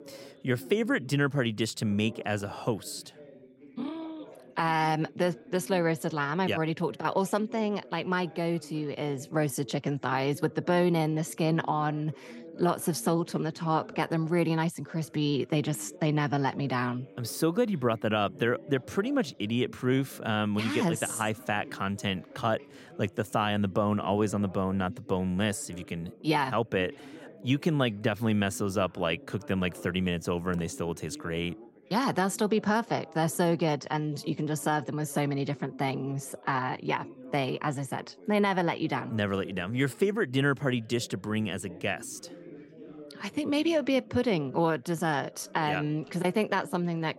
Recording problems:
background chatter; noticeable; throughout; 3 voices, 20 dB below the speech

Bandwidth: 16 kHz